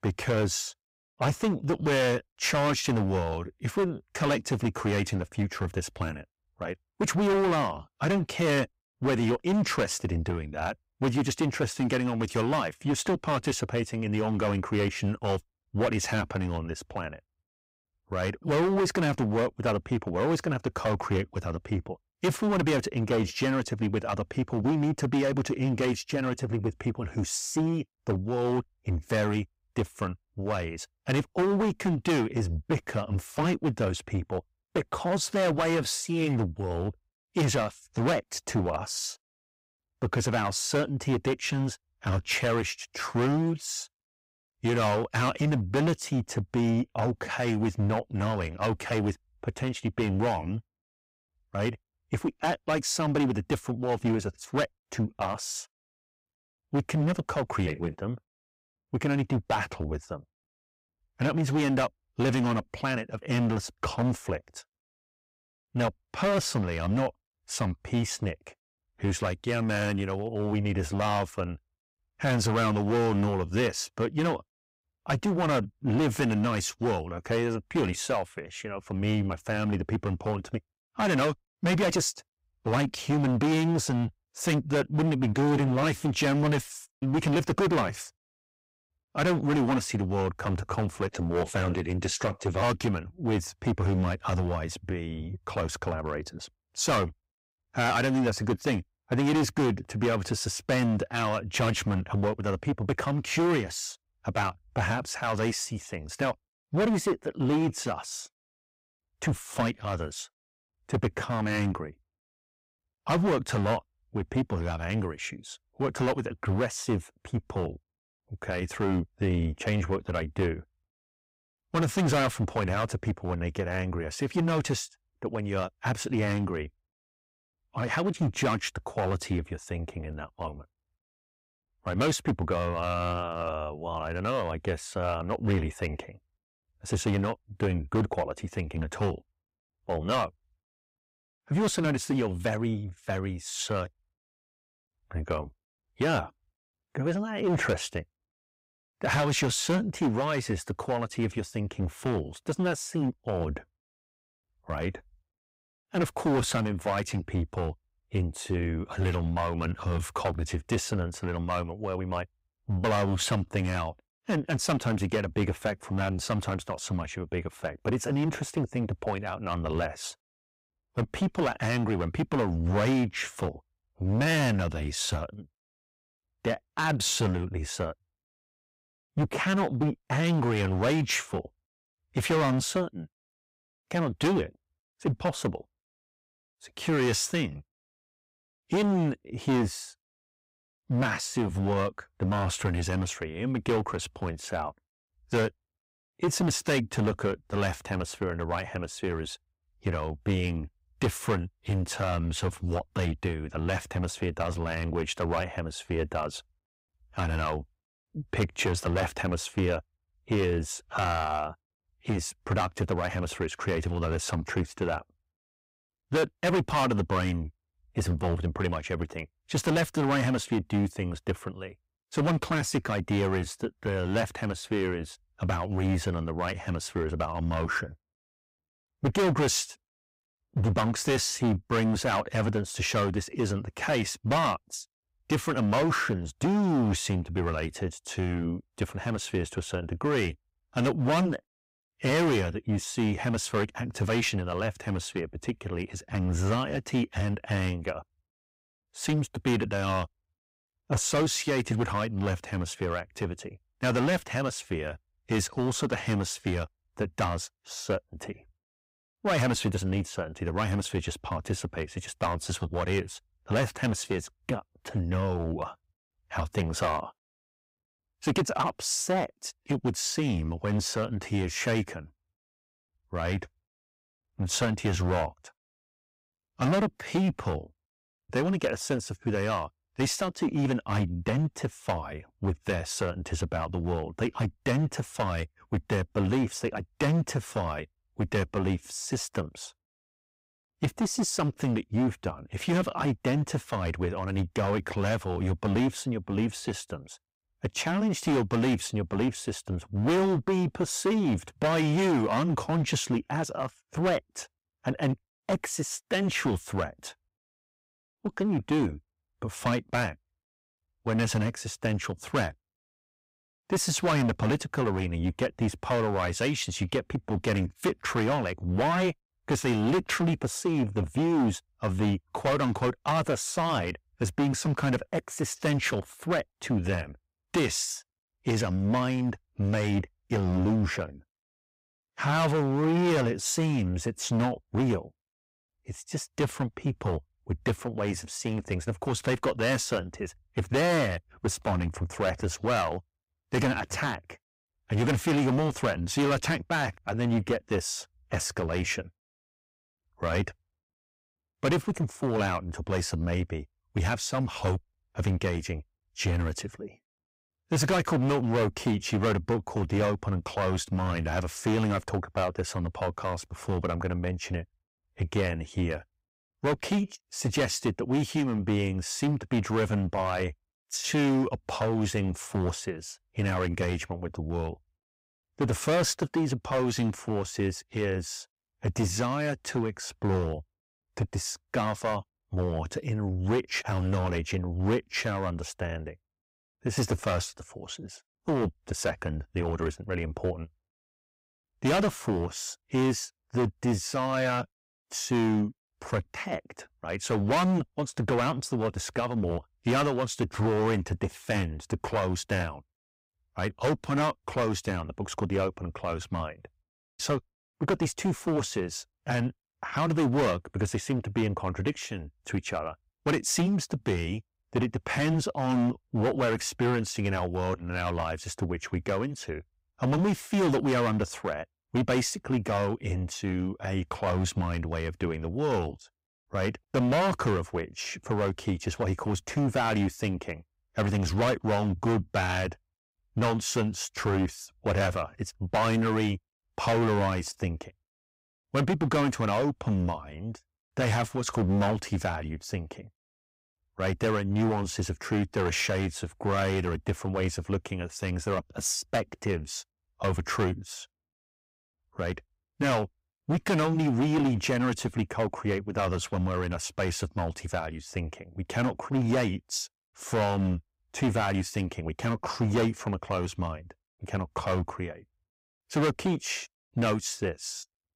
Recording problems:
distortion; heavy; 9% of the sound clipped

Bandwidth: 15.5 kHz